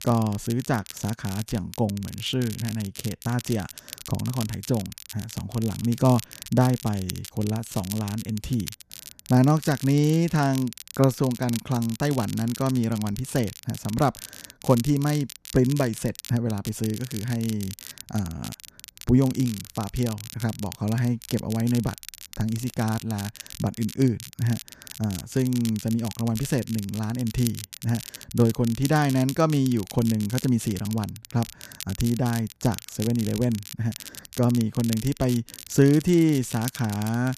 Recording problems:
crackle, like an old record; noticeable; 15 dB below the speech

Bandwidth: 14.5 kHz